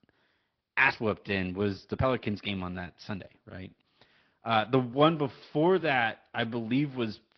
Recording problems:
high frequencies cut off; noticeable; nothing above 5.5 kHz
garbled, watery; slightly
uneven, jittery; strongly; from 0.5 to 6.5 s

